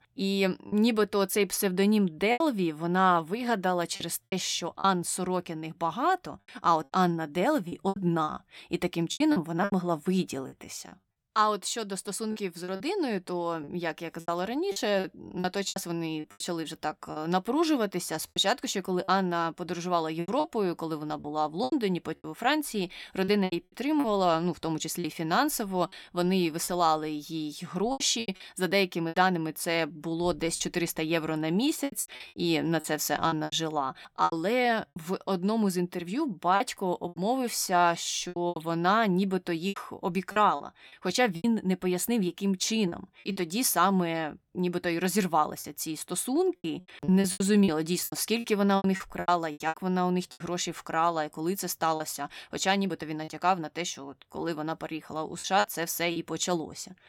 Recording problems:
choppy; very; 9% of the speech affected

